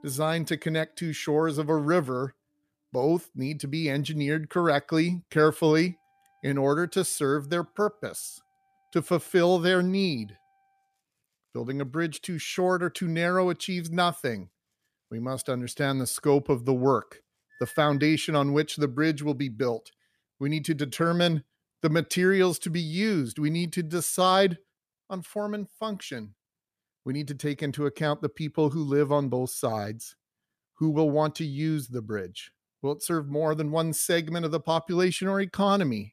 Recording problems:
background music; faint; until 18 s; 30 dB below the speech

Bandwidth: 14.5 kHz